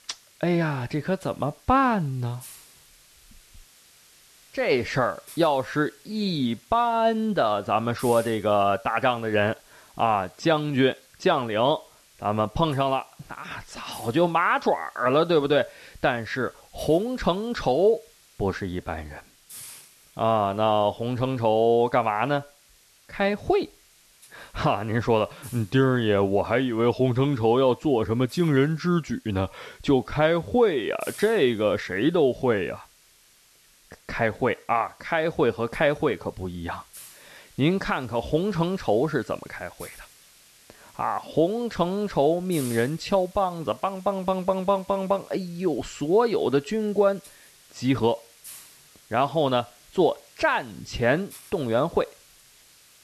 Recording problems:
hiss; faint; throughout; 25 dB below the speech

